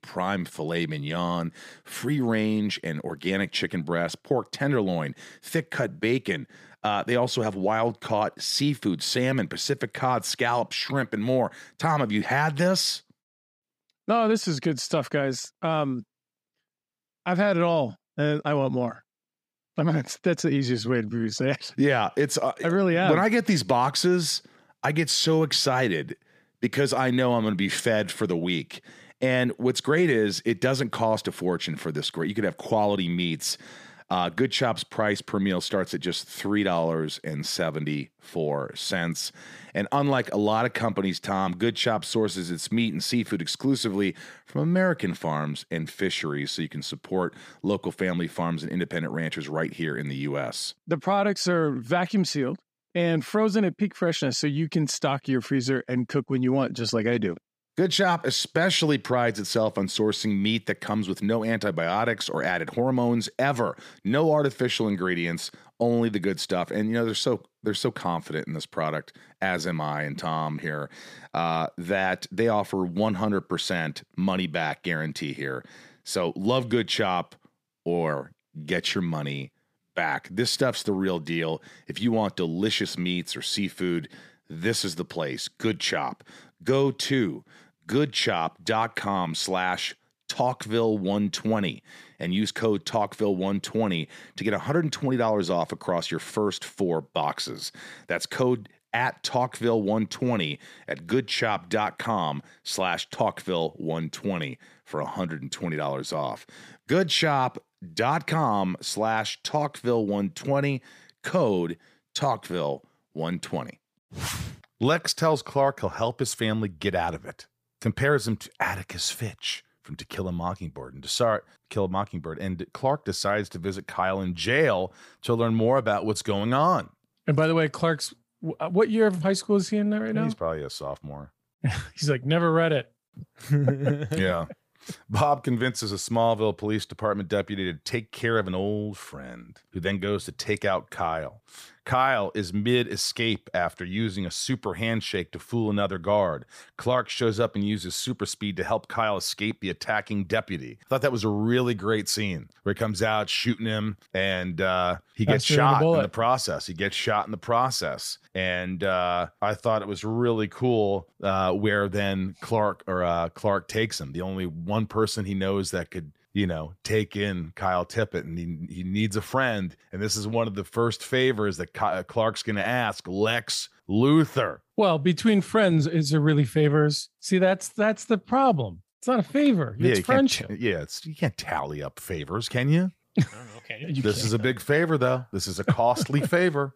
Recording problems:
none

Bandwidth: 15 kHz